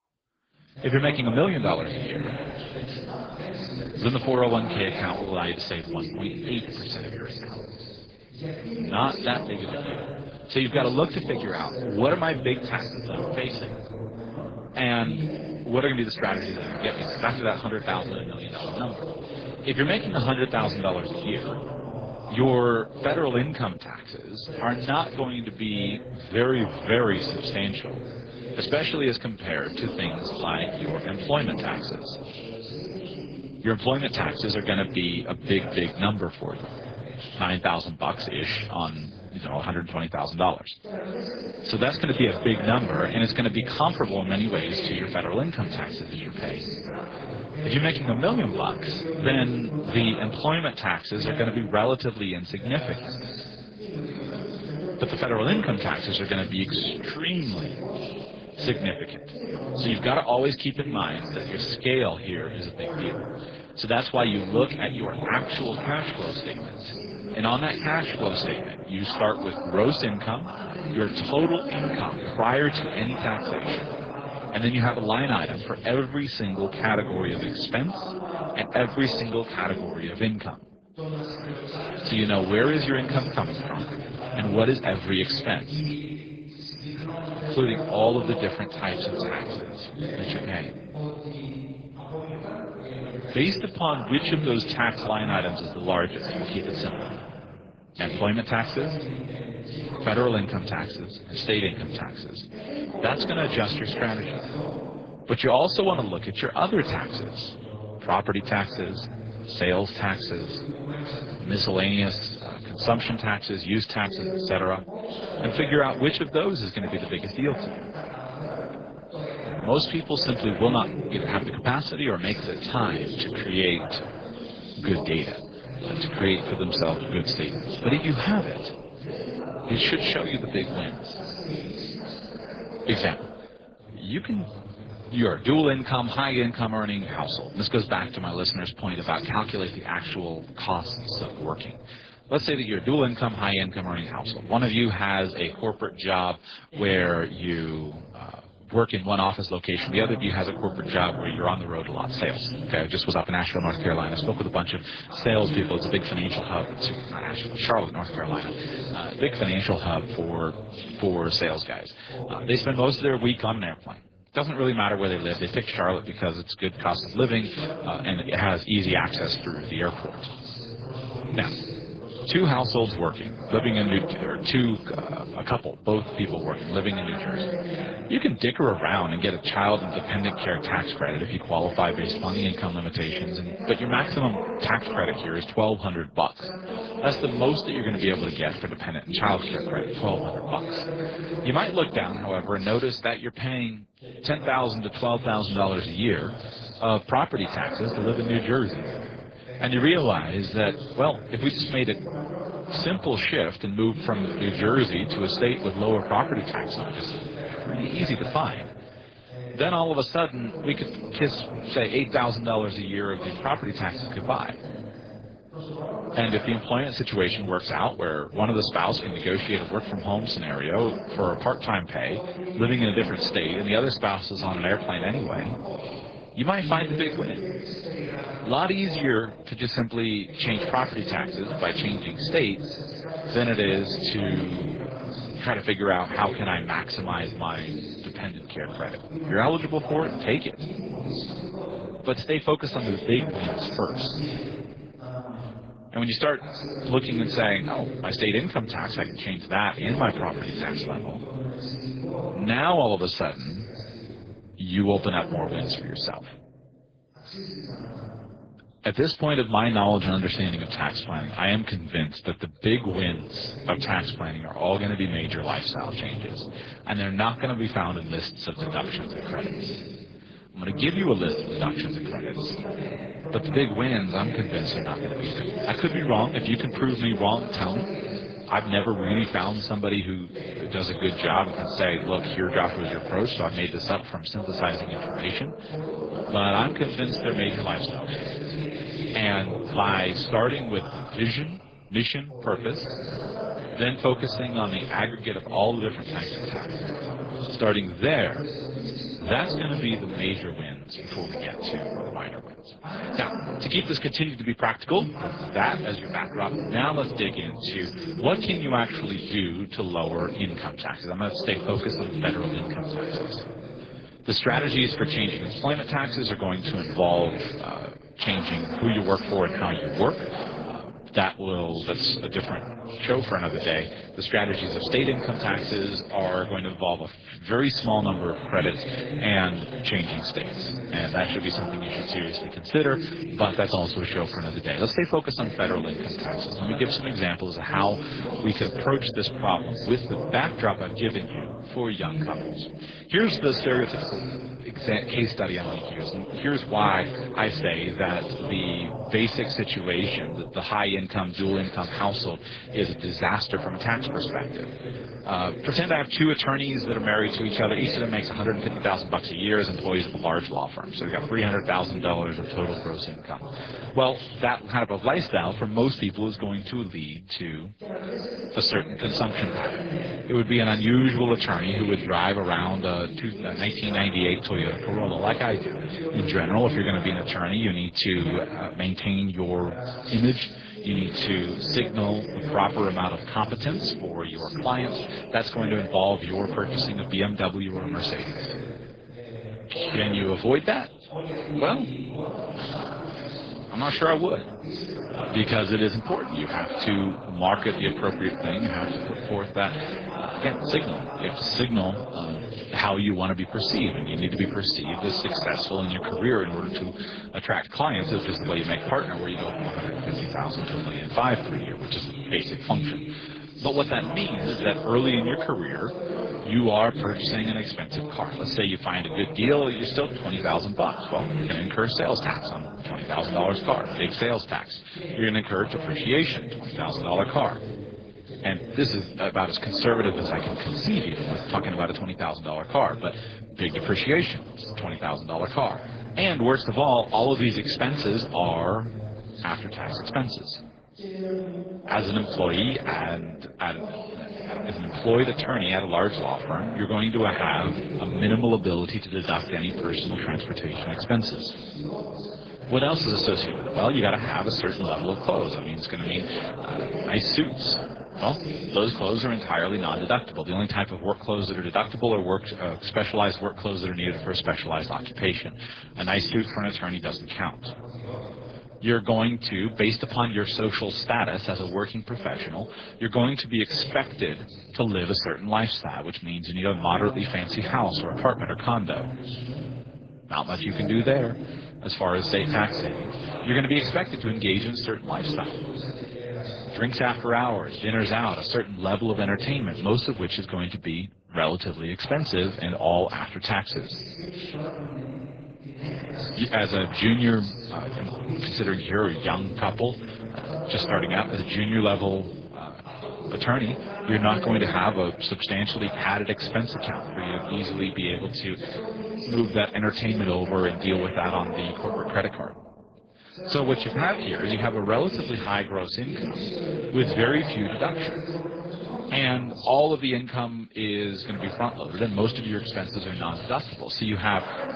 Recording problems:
garbled, watery; badly
voice in the background; loud; throughout; 8 dB below the speech

